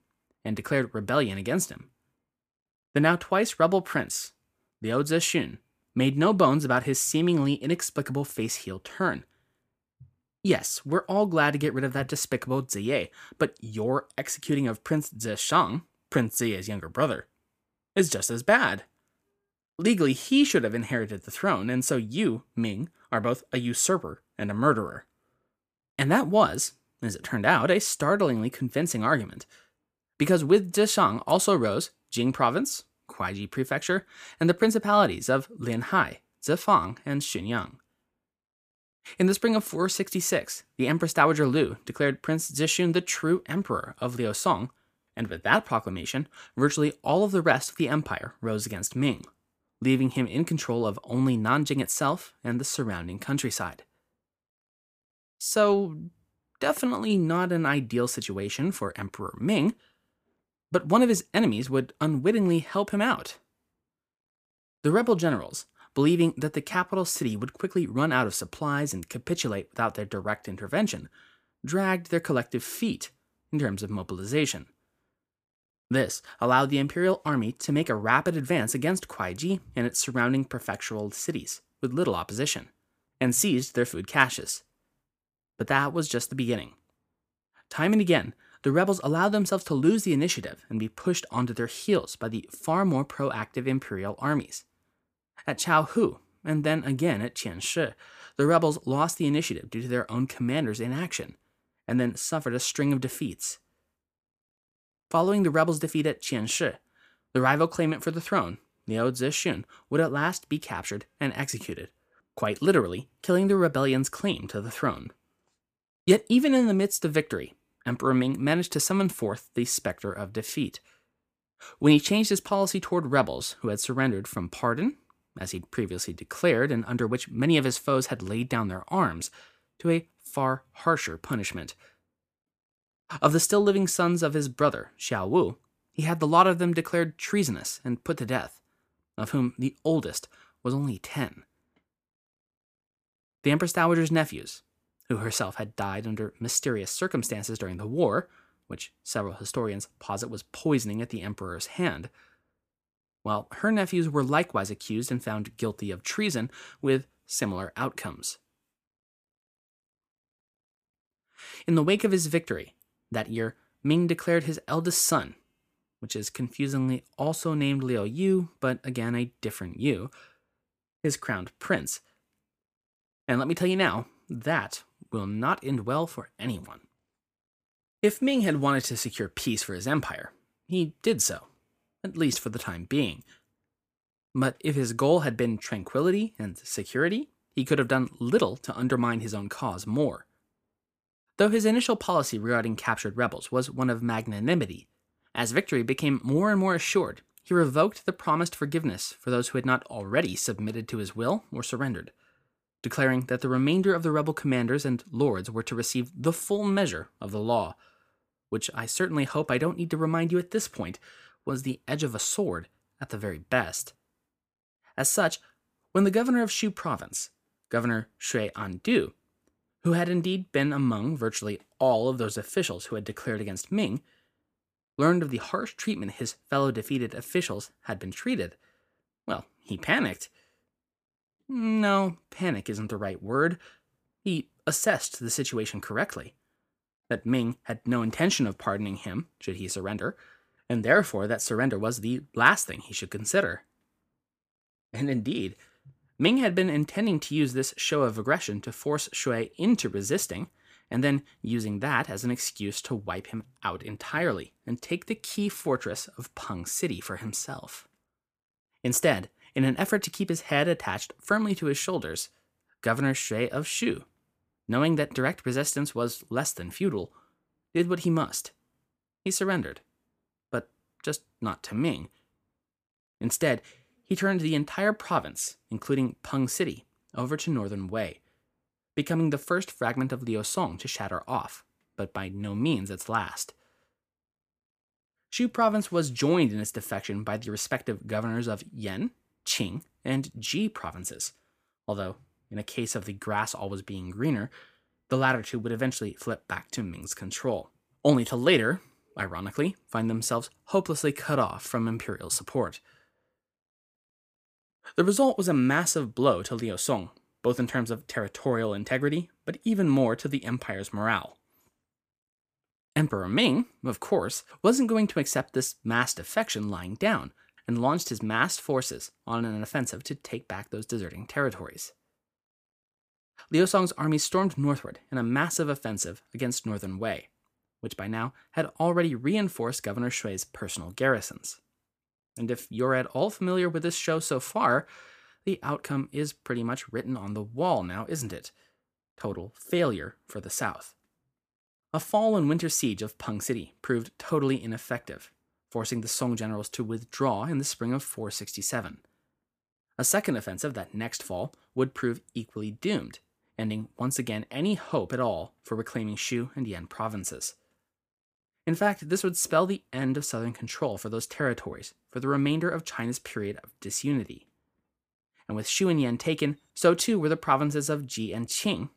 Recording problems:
none

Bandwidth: 15 kHz